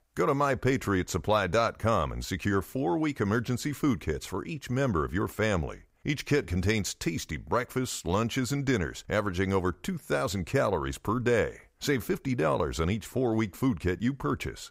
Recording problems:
none

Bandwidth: 15.5 kHz